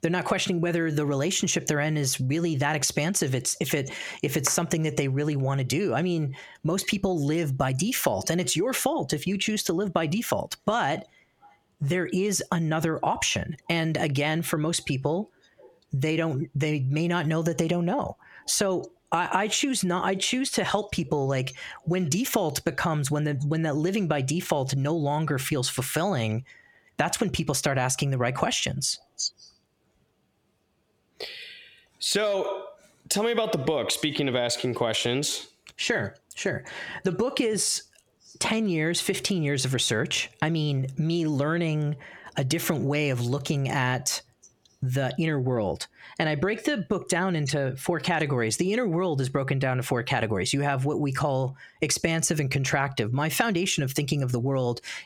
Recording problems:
squashed, flat; heavily

